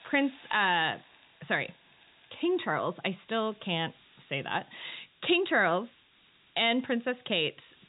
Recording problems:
high frequencies cut off; severe; nothing above 4 kHz
hiss; faint; throughout; 30 dB below the speech

